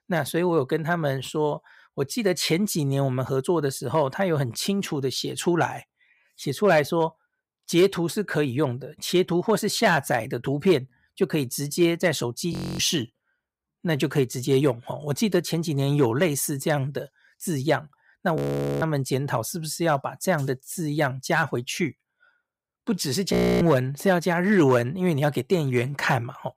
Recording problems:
audio freezing; at 13 s, at 18 s and at 23 s

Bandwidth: 15.5 kHz